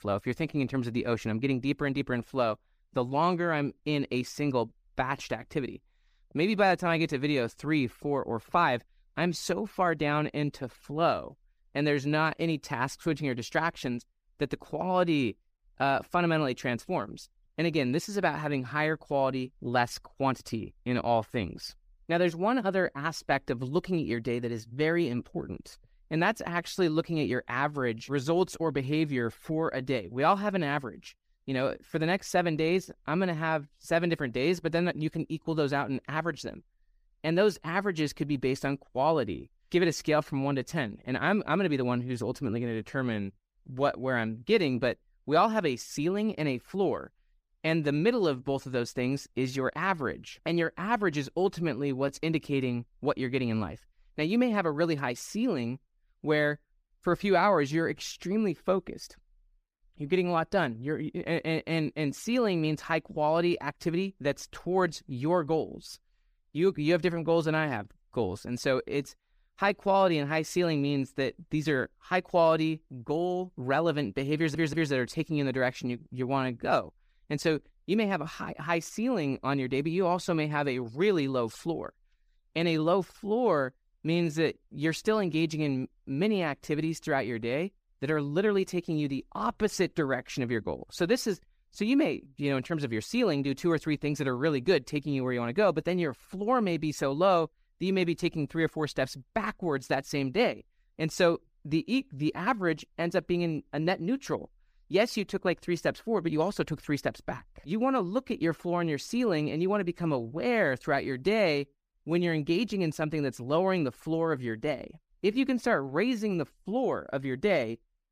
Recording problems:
audio stuttering; at 1:14

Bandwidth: 15 kHz